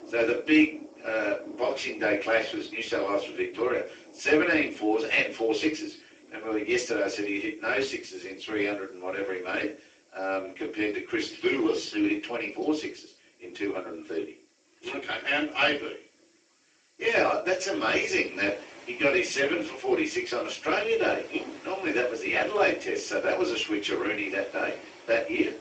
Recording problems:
off-mic speech; far
garbled, watery; badly; nothing above 7.5 kHz
thin; somewhat; fading below 300 Hz
room echo; slight; dies away in 0.3 s
rain or running water; faint; throughout; 20 dB below the speech
high-pitched whine; very faint; throughout; 4 kHz, 65 dB below the speech

